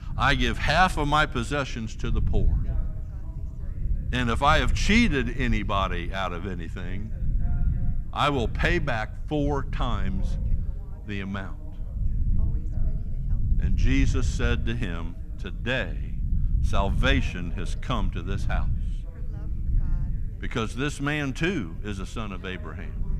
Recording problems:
background chatter; faint; throughout; 2 voices, 25 dB below the speech
low rumble; faint; throughout; 20 dB below the speech

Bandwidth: 14.5 kHz